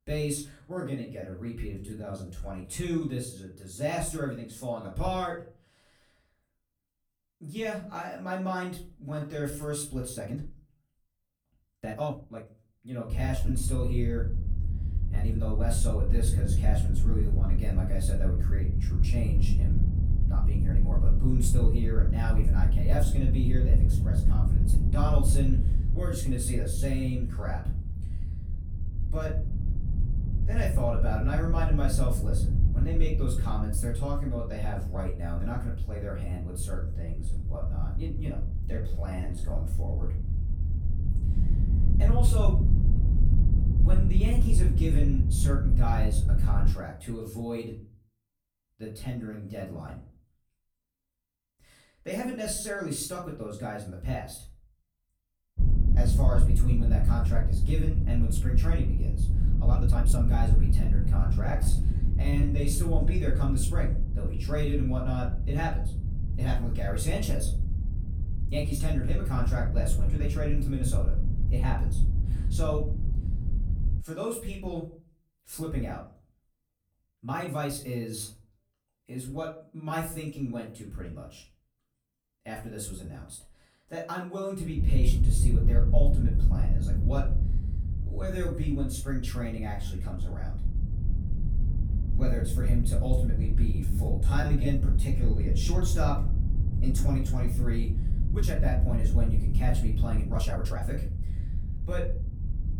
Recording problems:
off-mic speech; far
room echo; slight; dies away in 0.4 s
low rumble; loud; from 13 to 47 s, from 56 s to 1:14 and from 1:25 on; 7 dB below the speech
uneven, jittery; strongly; from 0.5 s to 1:41

